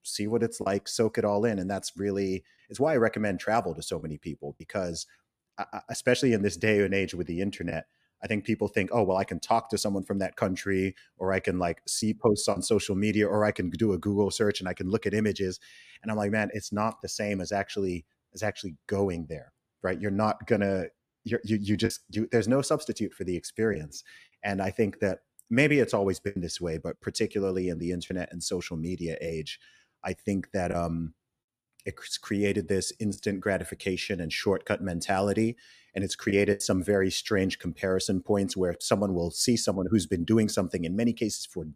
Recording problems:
choppy; occasionally; 1% of the speech affected

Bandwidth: 14.5 kHz